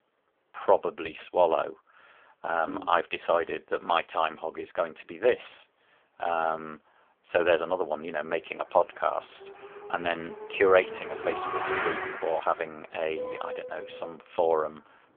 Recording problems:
phone-call audio; poor line; nothing above 3.5 kHz
traffic noise; loud; from 8 s on; 7 dB below the speech

